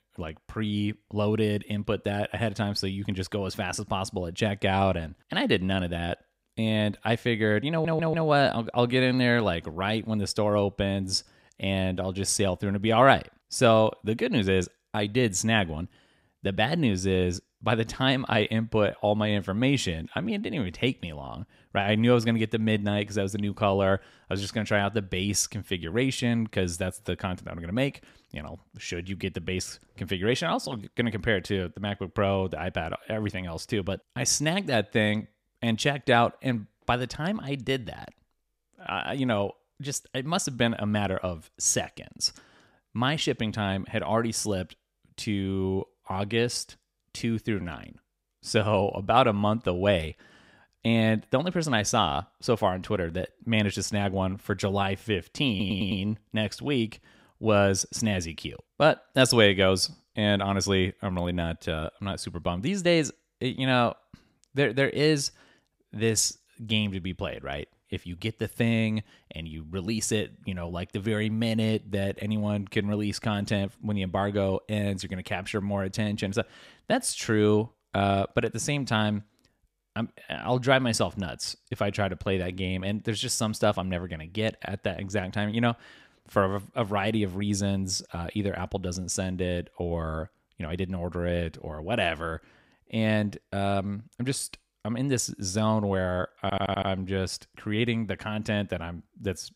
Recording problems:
audio stuttering; at 7.5 s, at 56 s and at 1:36

